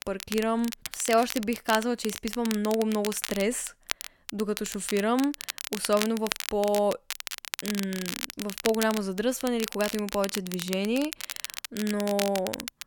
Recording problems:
crackle, like an old record; loud; 7 dB below the speech

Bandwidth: 17.5 kHz